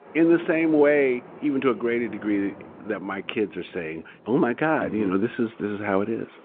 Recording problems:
phone-call audio
rain or running water; faint; throughout; 20 dB below the speech

